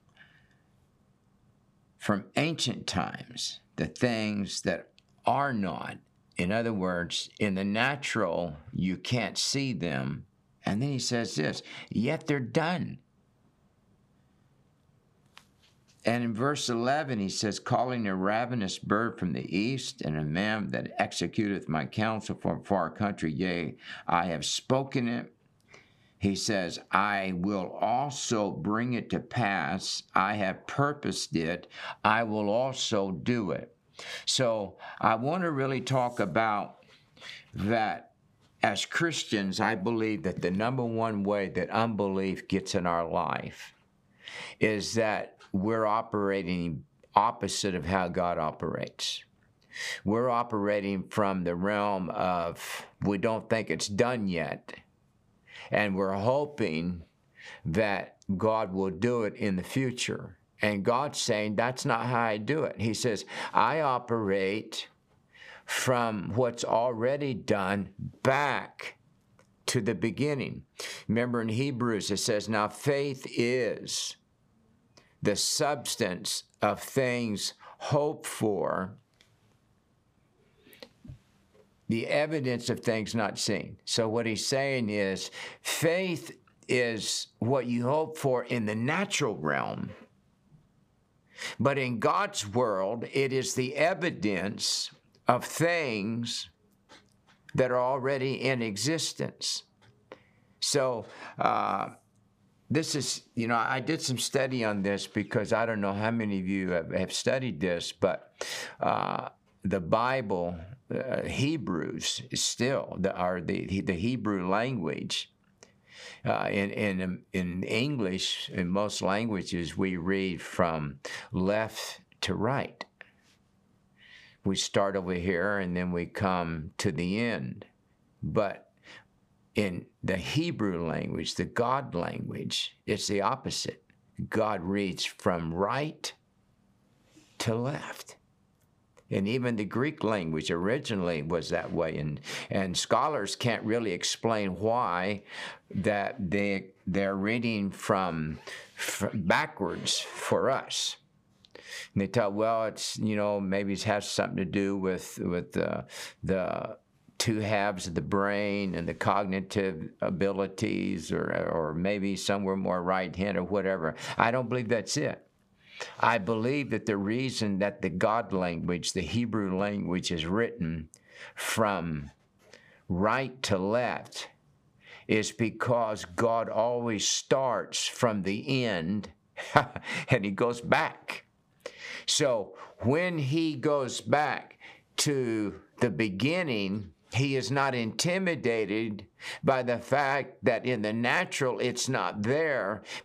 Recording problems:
squashed, flat; heavily

